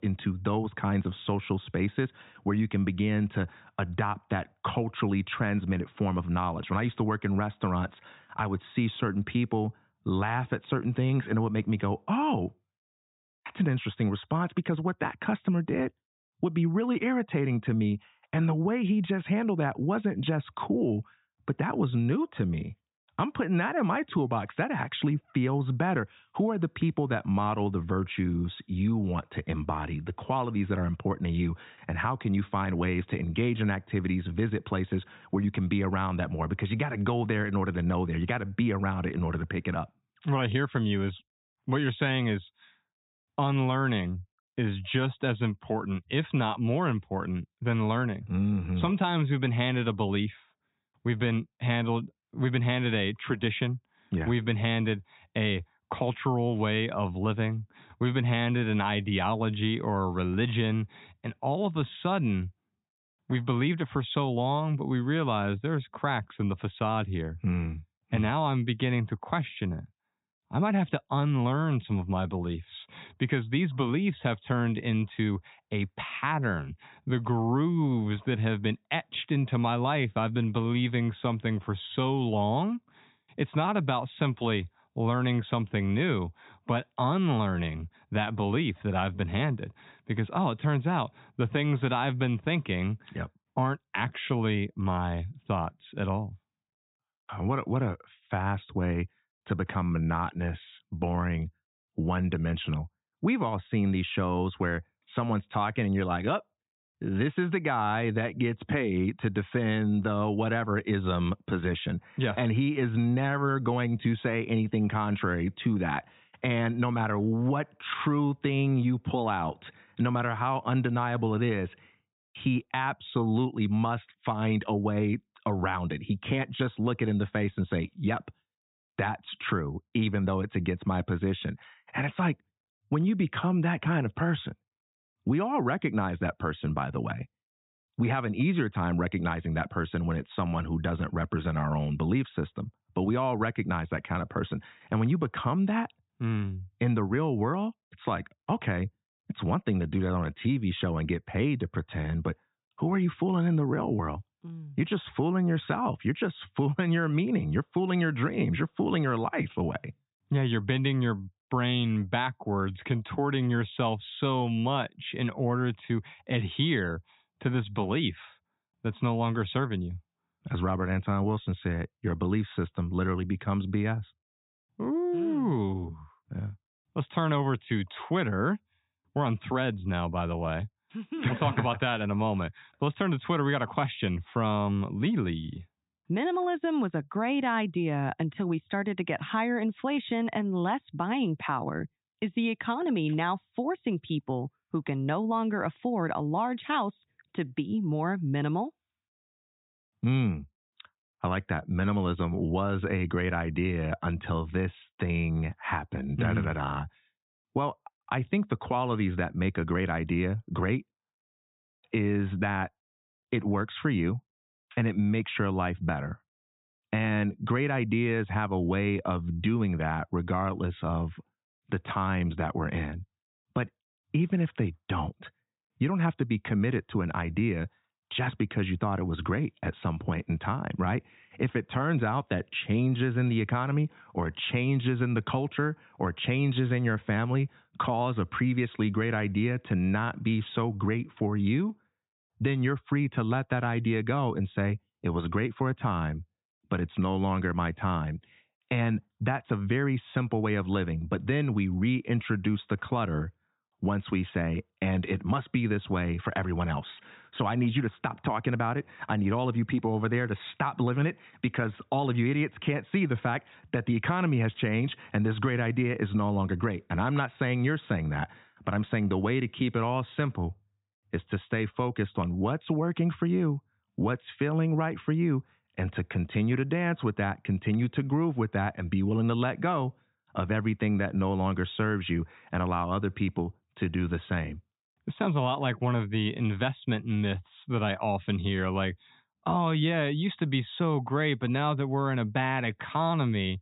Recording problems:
high frequencies cut off; severe; nothing above 4 kHz

